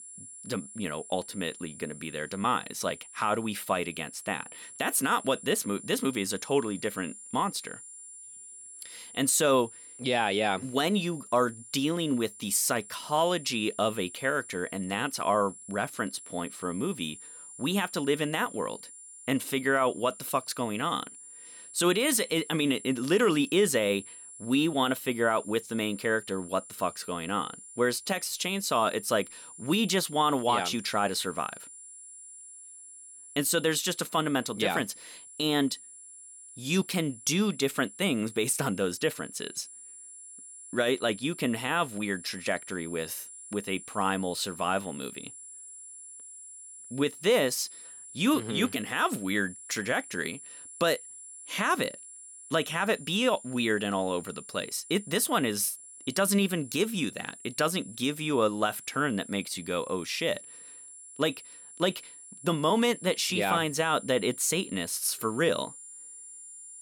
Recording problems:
high-pitched whine; noticeable; throughout; 9.5 kHz, 15 dB below the speech

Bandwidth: 18 kHz